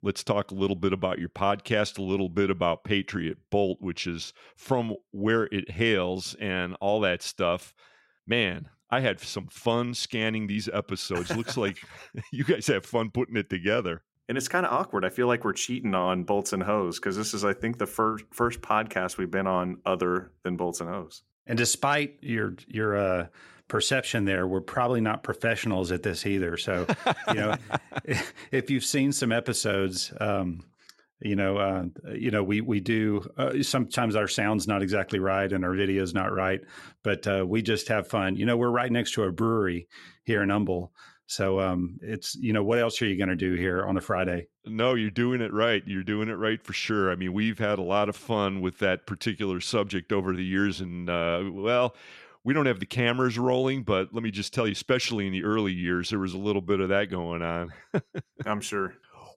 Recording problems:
none

